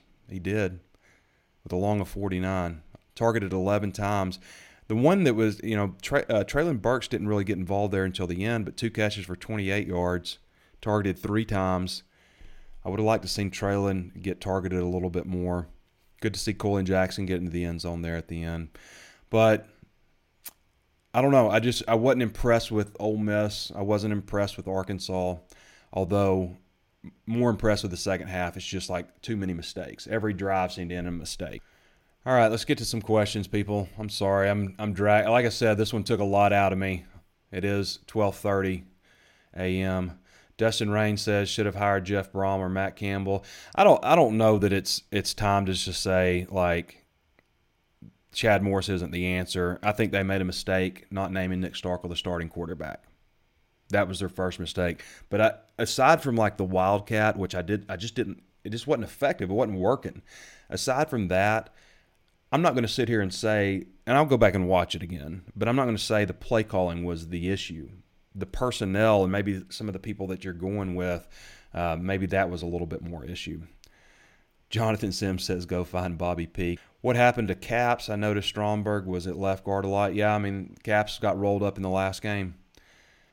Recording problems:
none

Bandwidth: 16.5 kHz